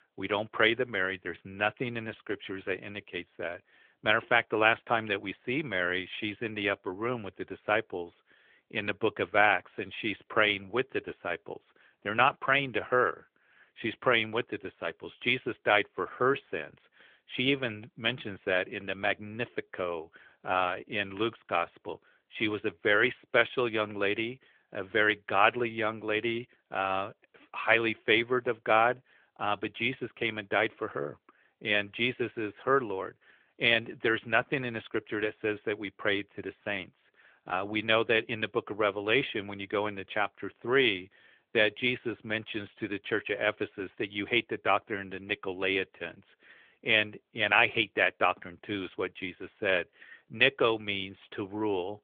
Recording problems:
phone-call audio; nothing above 3.5 kHz

